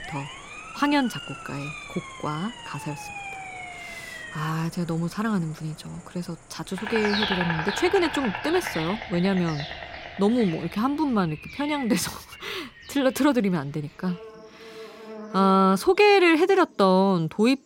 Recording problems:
animal sounds; loud; throughout; 10 dB below the speech
siren; faint; until 4.5 s; peak 10 dB below the speech

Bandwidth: 16 kHz